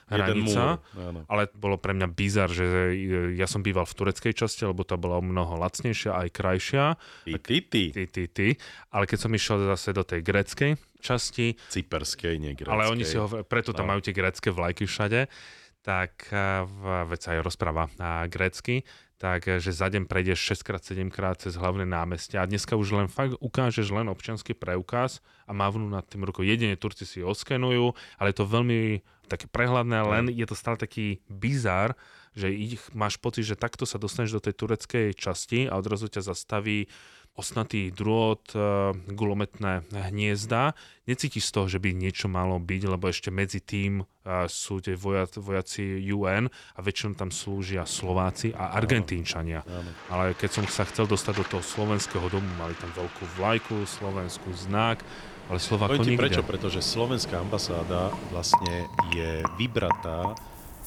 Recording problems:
rain or running water; loud; from 48 s on; 7 dB below the speech

